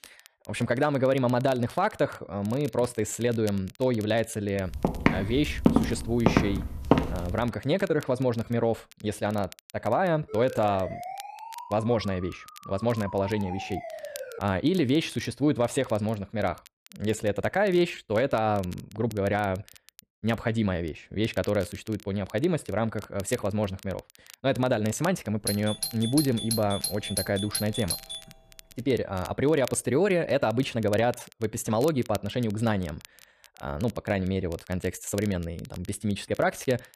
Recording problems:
crackle, like an old record; faint; 20 dB below the speech
footsteps; loud; from 5 to 7 s; peak 4 dB above the speech
siren; noticeable; from 10 to 14 s; peak 10 dB below the speech
doorbell; noticeable; from 25 to 28 s; peak 2 dB below the speech

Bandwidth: 14.5 kHz